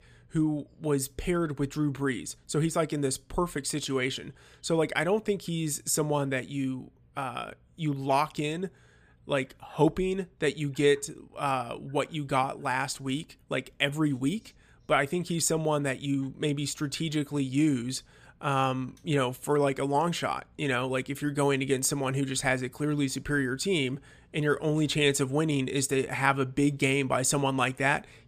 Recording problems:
none

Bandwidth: 15 kHz